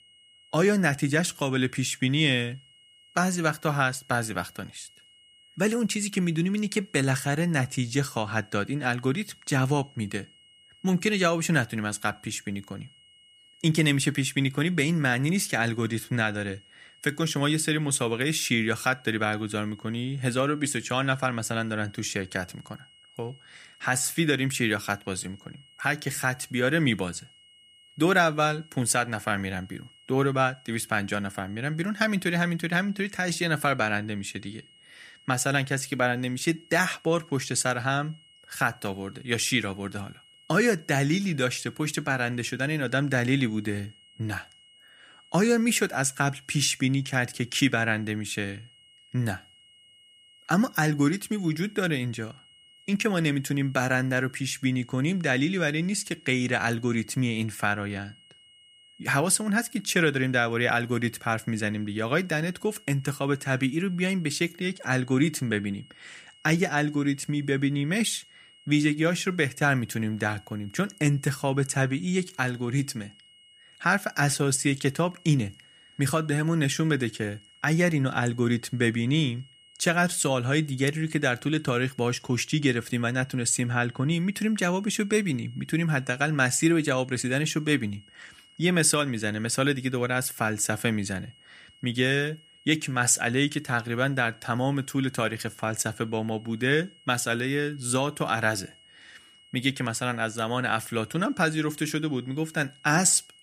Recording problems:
high-pitched whine; faint; throughout; 3 kHz, 25 dB below the speech

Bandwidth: 15 kHz